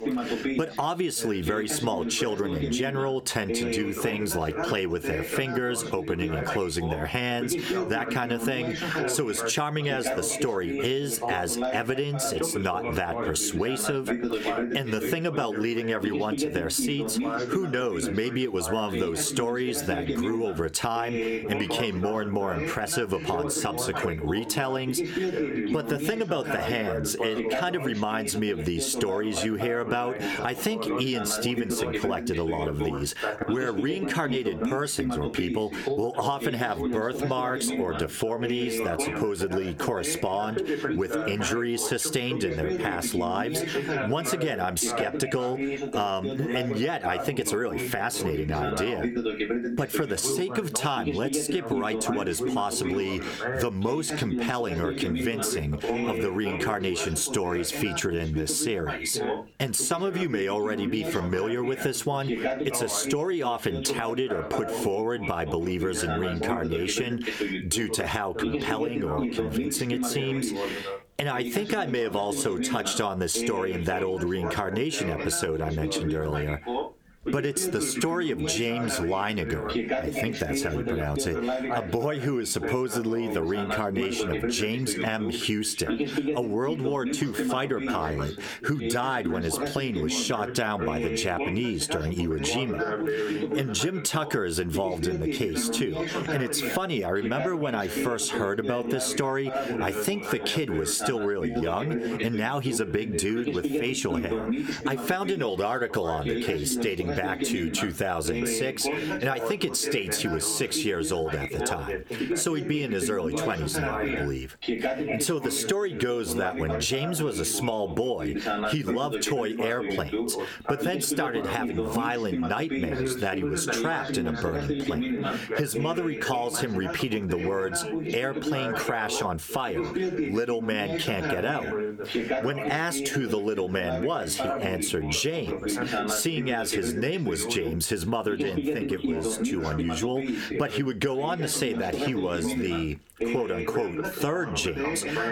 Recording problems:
squashed, flat; heavily, background pumping
background chatter; loud; throughout; 2 voices, 4 dB below the speech

